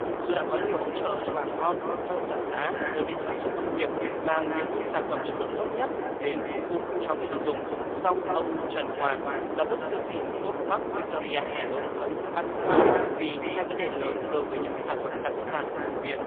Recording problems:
phone-call audio; poor line; nothing above 3.5 kHz
echo of what is said; strong; throughout; 220 ms later, 7 dB below the speech
wind noise on the microphone; heavy; as loud as the speech

